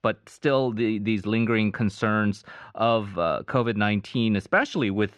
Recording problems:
muffled; slightly; fading above 3 kHz

